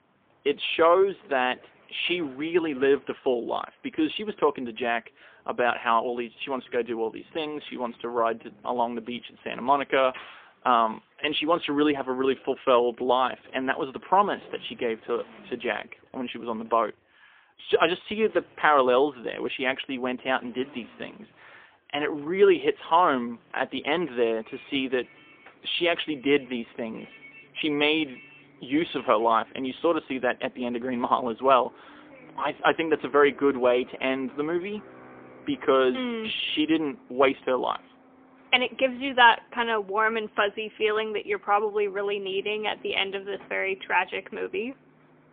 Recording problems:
phone-call audio; poor line; nothing above 3.5 kHz
traffic noise; faint; throughout; 25 dB below the speech

